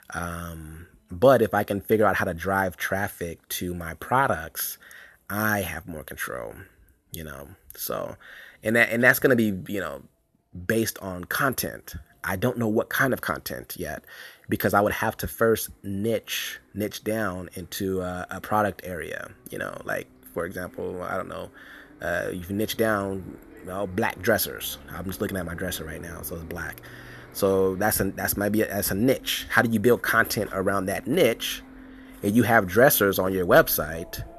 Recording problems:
traffic noise; faint; throughout; 25 dB below the speech

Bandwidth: 13.5 kHz